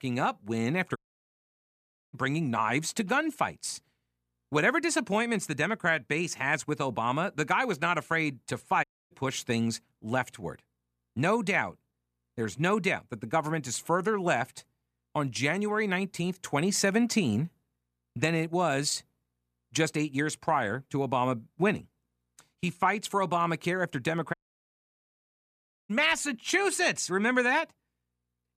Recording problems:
audio cutting out; at 1 s for 1 s, at 9 s and at 24 s for 1.5 s

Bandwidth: 14.5 kHz